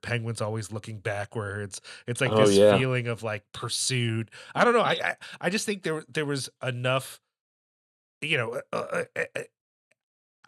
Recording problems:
none

